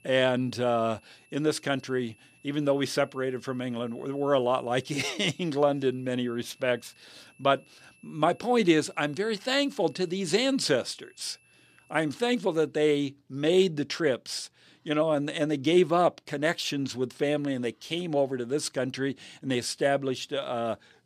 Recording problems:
high-pitched whine; faint; until 13 s; 2.5 kHz, 30 dB below the speech

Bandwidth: 14.5 kHz